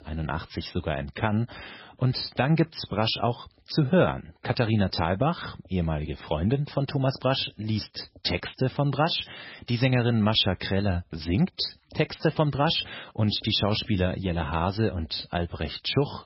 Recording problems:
garbled, watery; badly; nothing above 5.5 kHz

